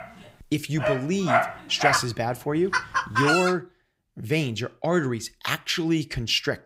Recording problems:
animal sounds; very loud; until 3.5 s; 1 dB above the speech

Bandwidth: 15.5 kHz